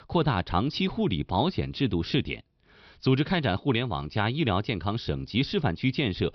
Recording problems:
high frequencies cut off; noticeable; nothing above 5.5 kHz

